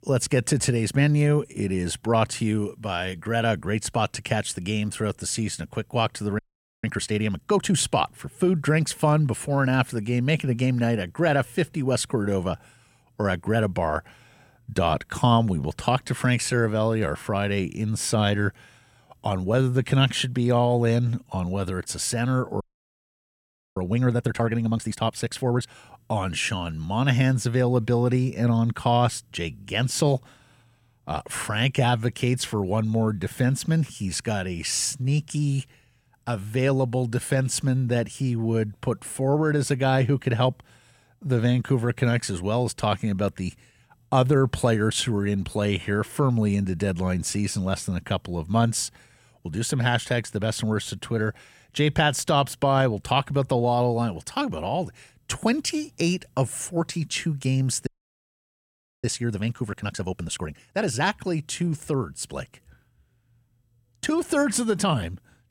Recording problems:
audio freezing; at 6.5 s, at 23 s for 1 s and at 58 s for 1 s

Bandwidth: 16.5 kHz